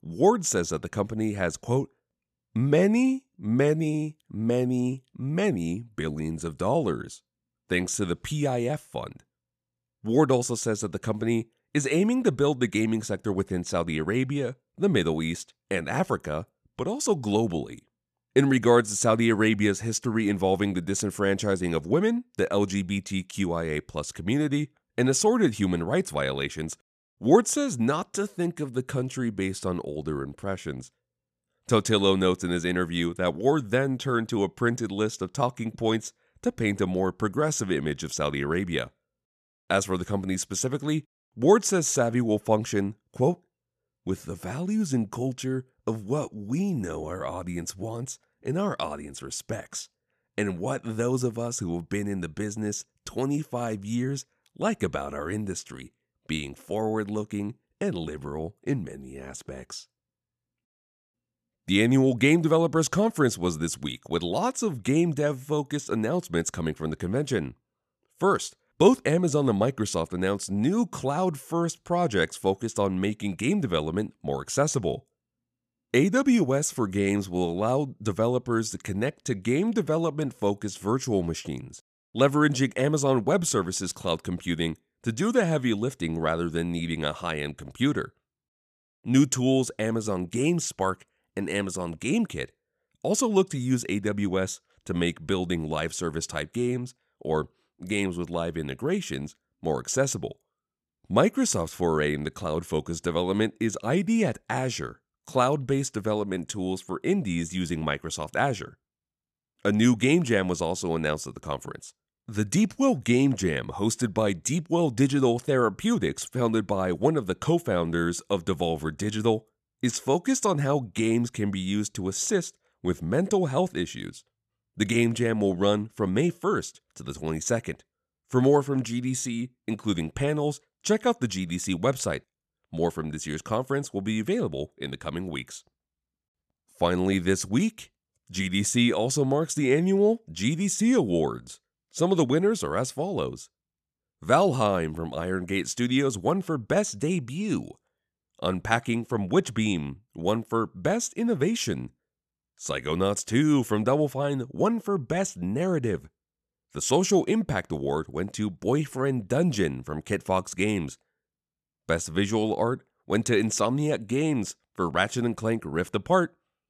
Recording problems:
none

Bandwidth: 14 kHz